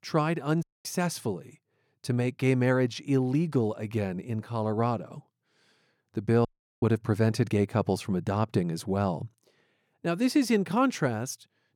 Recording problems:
audio cutting out; at 0.5 s and at 6.5 s

